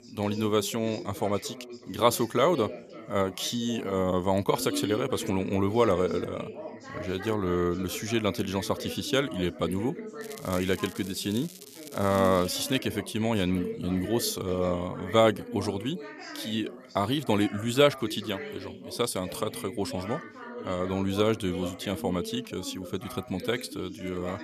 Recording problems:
background chatter; noticeable; throughout; 2 voices, 10 dB below the speech
crackling; noticeable; from 10 to 13 s; 15 dB below the speech

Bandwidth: 14.5 kHz